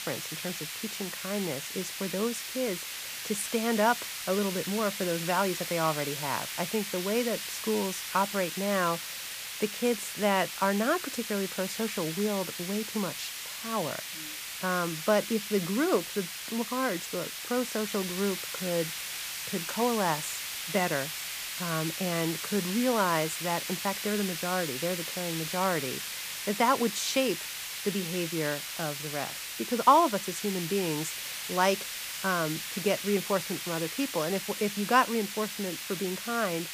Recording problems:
hiss; loud; throughout; 4 dB below the speech

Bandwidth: 15 kHz